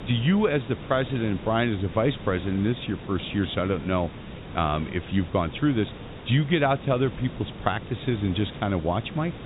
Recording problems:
high frequencies cut off; severe; nothing above 4 kHz
hiss; noticeable; throughout; 15 dB below the speech

